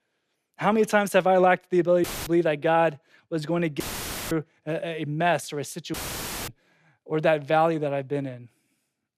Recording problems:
audio cutting out; filled with static; at 2 s, at 4 s for 0.5 s and at 6 s for 0.5 s

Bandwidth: 14.5 kHz